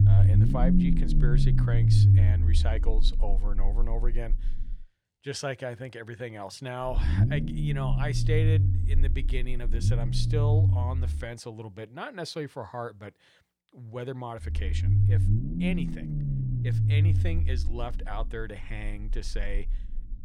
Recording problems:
low rumble; loud; until 5 s, from 7 to 11 s and from 14 s on; as loud as the speech

